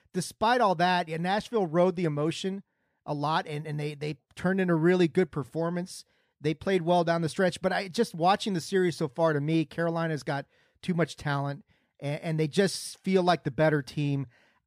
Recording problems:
none

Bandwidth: 15 kHz